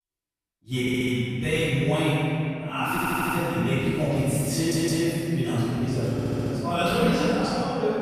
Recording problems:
room echo; strong; dies away in 2.5 s
off-mic speech; far
audio stuttering; 4 times, first at 1 s

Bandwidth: 14.5 kHz